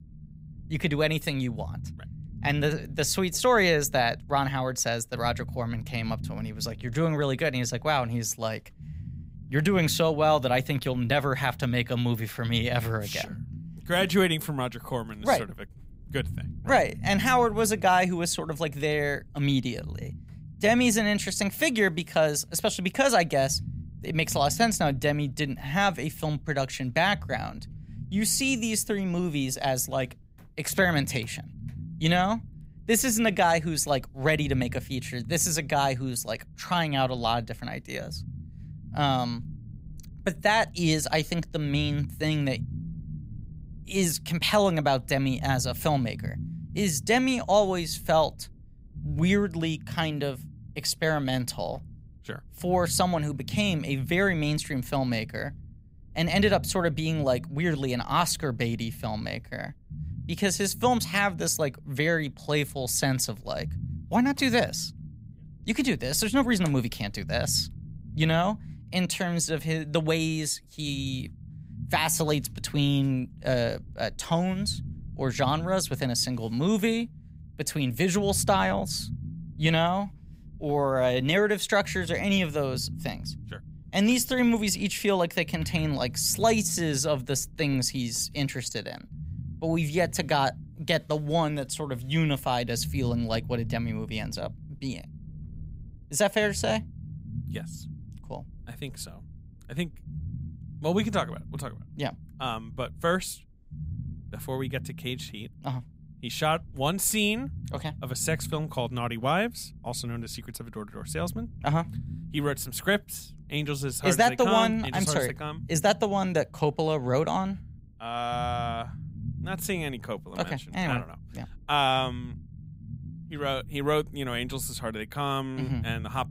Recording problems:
low rumble; faint; throughout; 25 dB below the speech

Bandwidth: 15.5 kHz